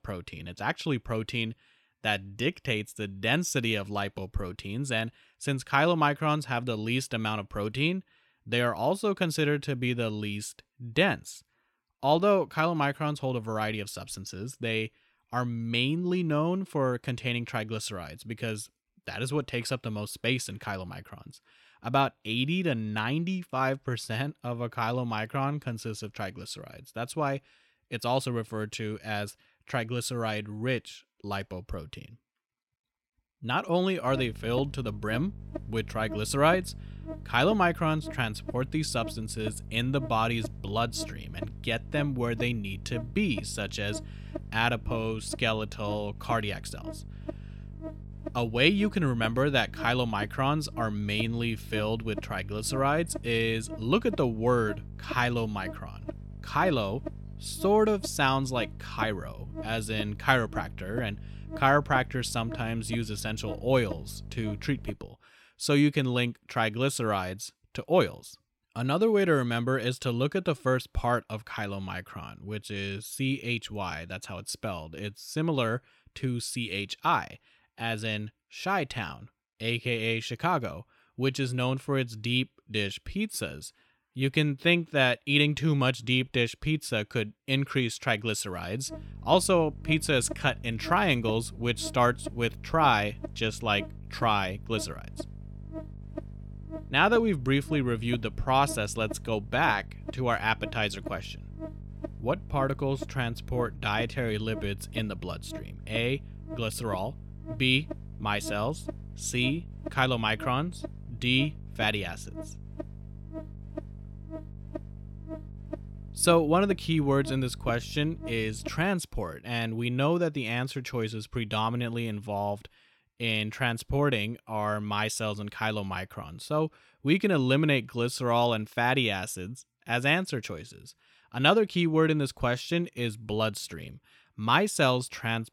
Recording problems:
electrical hum; noticeable; from 34 s to 1:05 and from 1:29 to 1:59; 50 Hz, 15 dB below the speech

